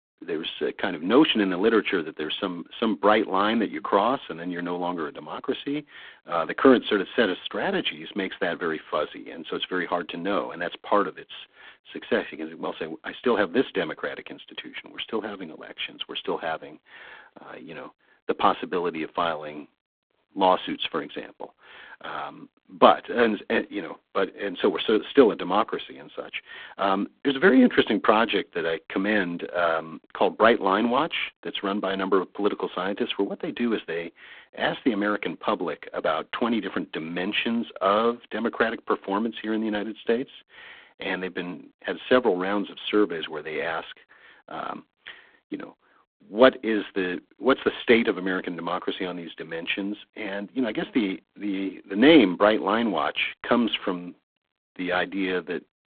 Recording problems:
phone-call audio; poor line

